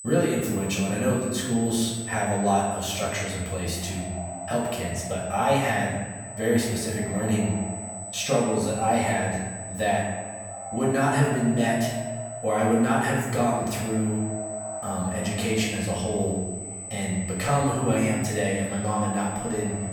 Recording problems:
off-mic speech; far
echo of what is said; noticeable; throughout; 550 ms later, 15 dB below the speech
room echo; noticeable; dies away in 1.1 s
high-pitched whine; noticeable; throughout; 8 kHz, 10 dB below the speech

